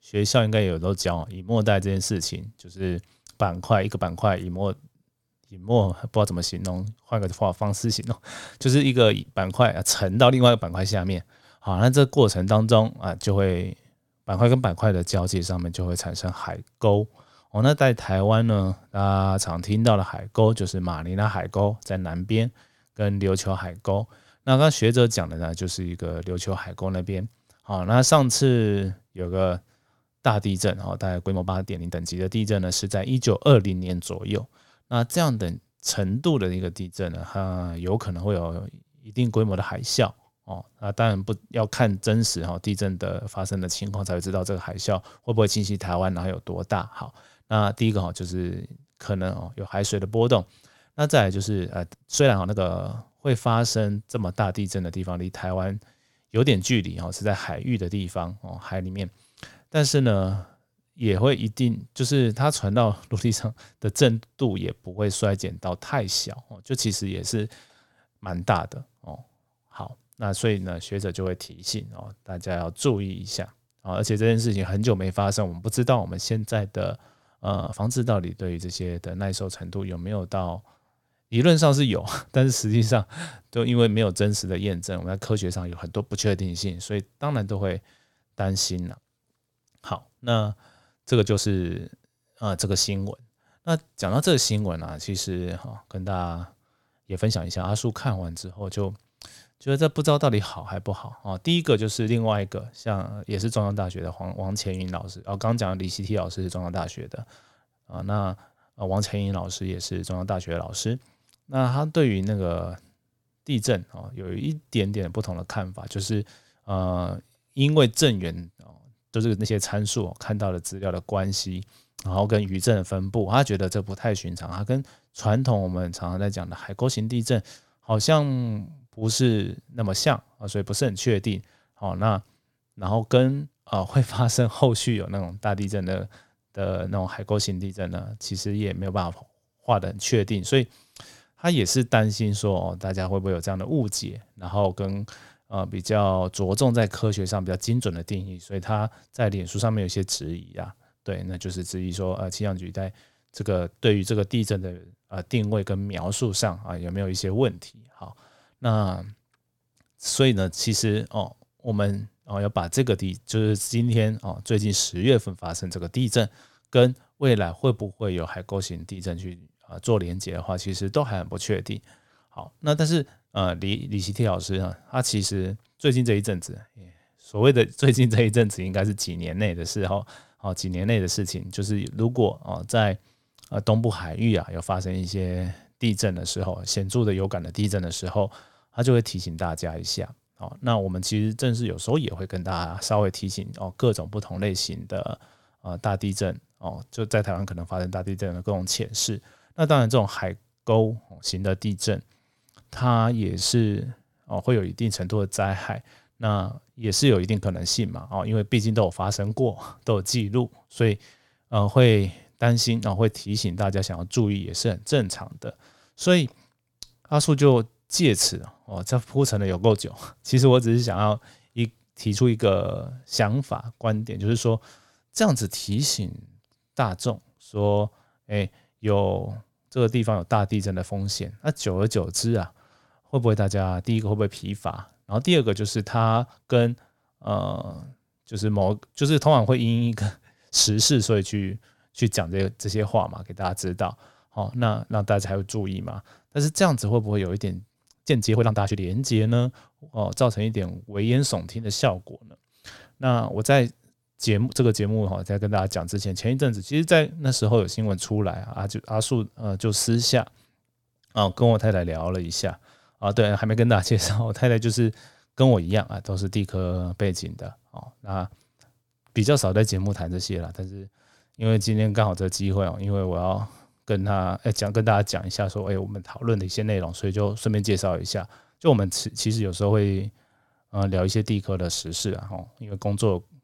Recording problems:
uneven, jittery; strongly; from 1 s to 4:42

